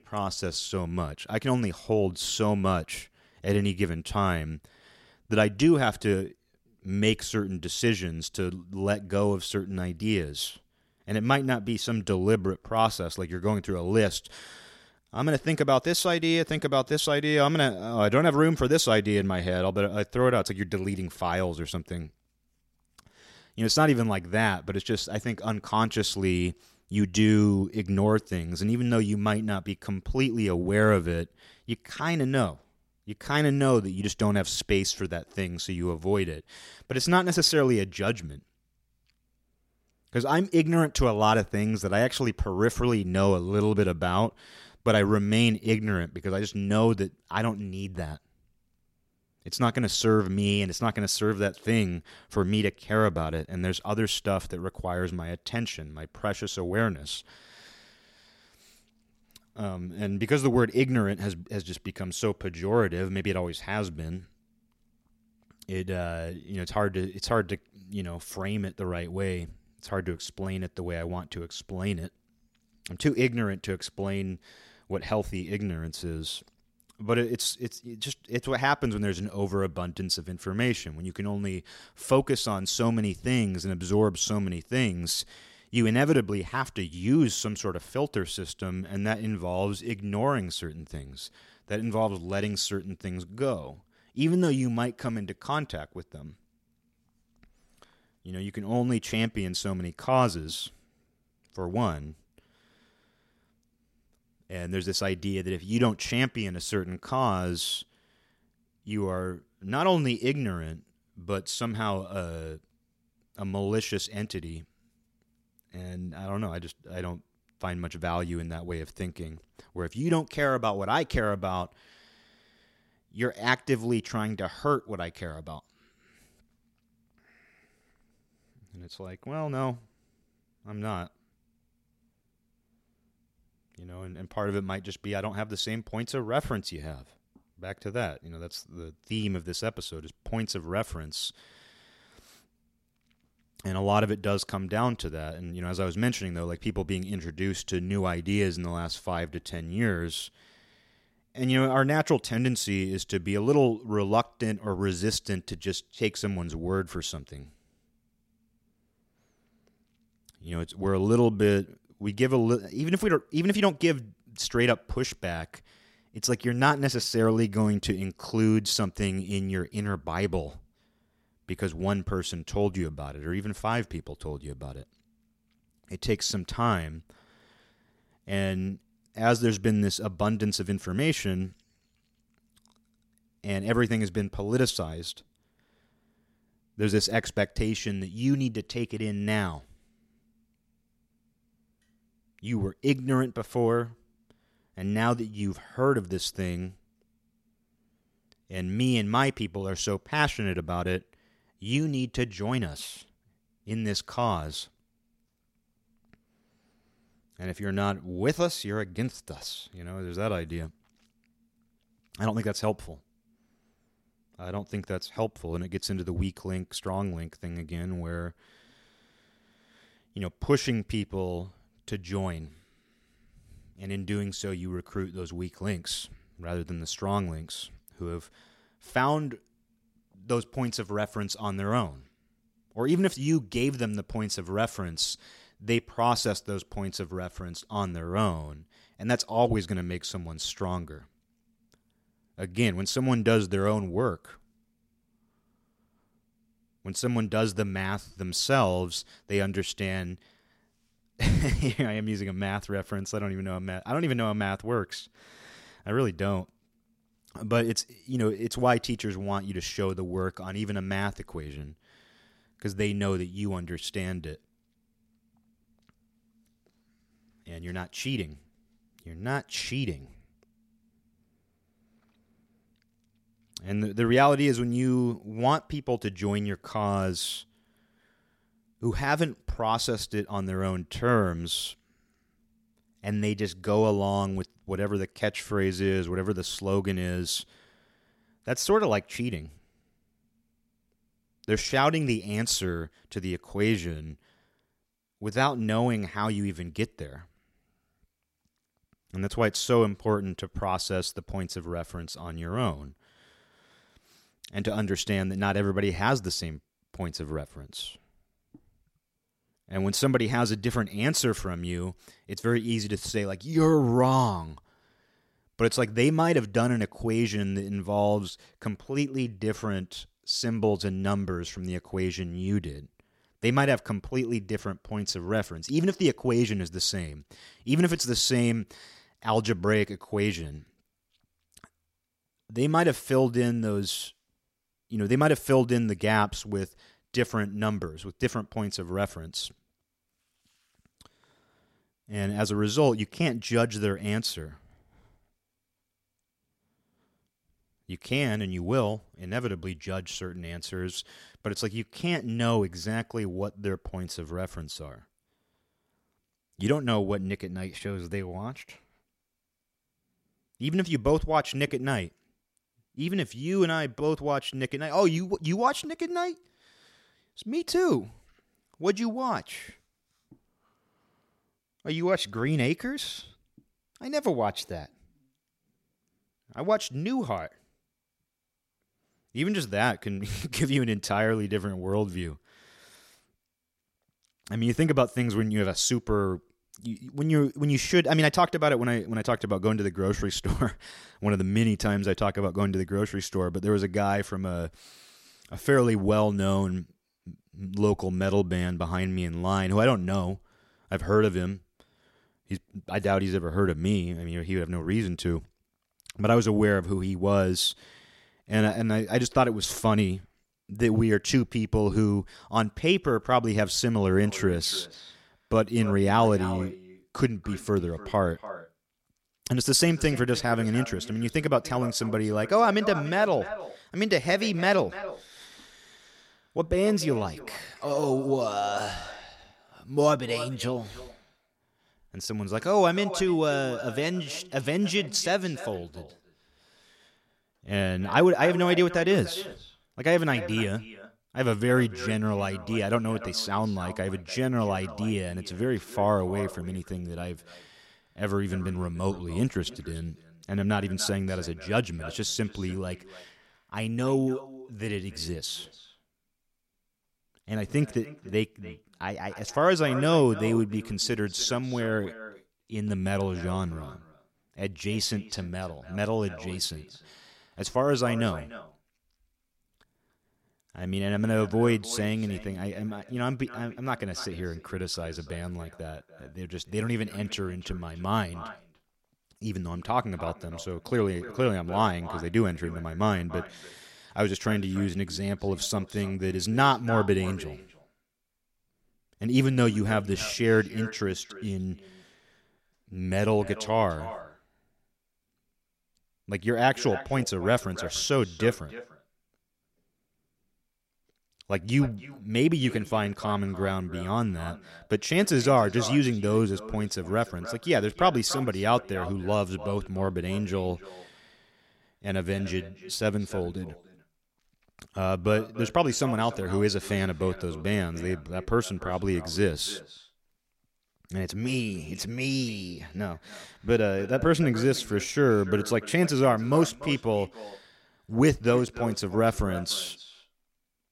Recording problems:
echo of what is said; noticeable; from 6:54 on; 290 ms later, 15 dB below the speech

